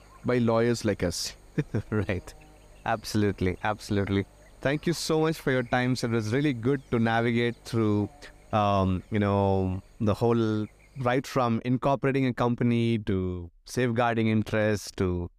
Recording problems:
electrical hum; faint; until 11 s; 50 Hz, 25 dB below the speech

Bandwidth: 15 kHz